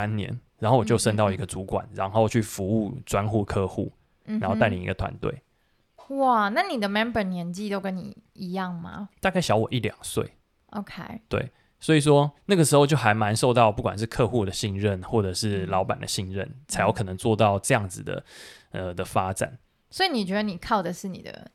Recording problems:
abrupt cut into speech; at the start

